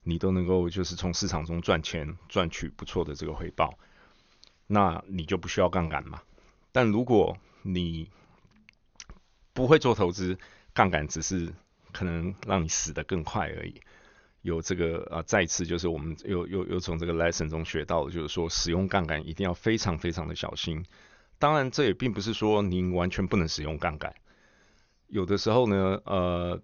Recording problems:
high frequencies cut off; noticeable; nothing above 6.5 kHz

